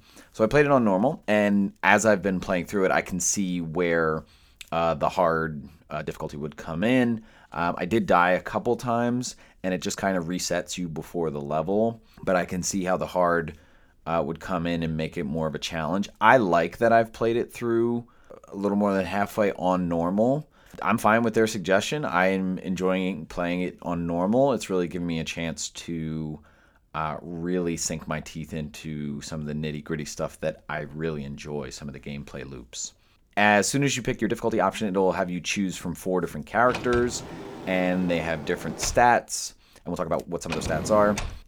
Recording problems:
uneven, jittery; strongly; from 1 to 41 s
door banging; noticeable; from 37 s on; peak 7 dB below the speech

